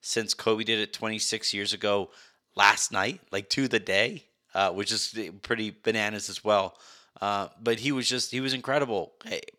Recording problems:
thin; very slightly; fading below 950 Hz

